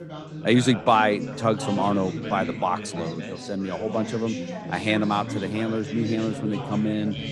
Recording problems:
background chatter; loud; throughout; 4 voices, 8 dB below the speech

